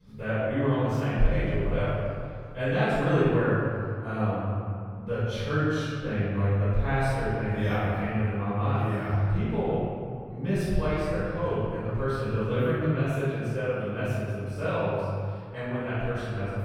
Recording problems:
room echo; strong; dies away in 2.1 s
off-mic speech; far

